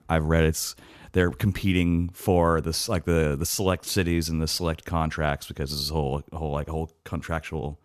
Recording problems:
none

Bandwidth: 14 kHz